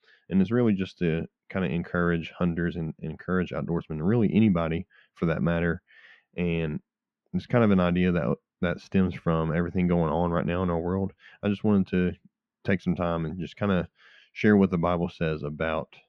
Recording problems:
muffled; very; fading above 2 kHz

